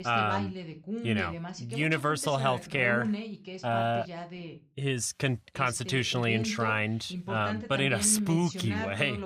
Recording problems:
voice in the background; loud; throughout; 8 dB below the speech

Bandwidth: 15 kHz